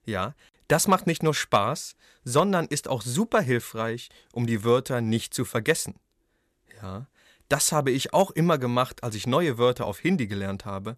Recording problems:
none

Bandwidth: 13.5 kHz